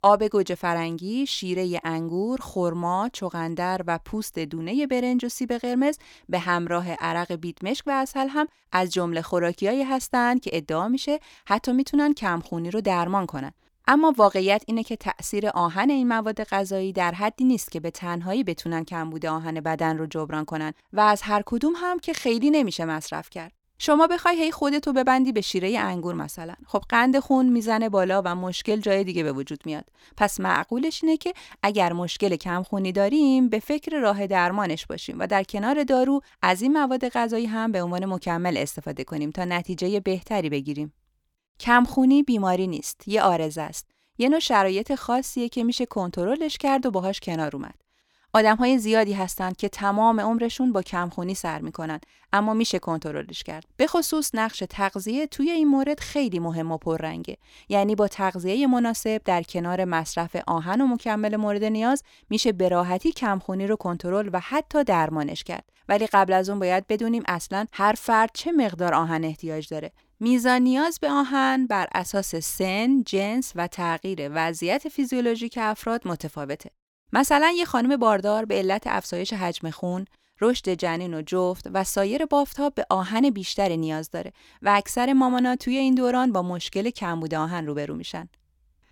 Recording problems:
none

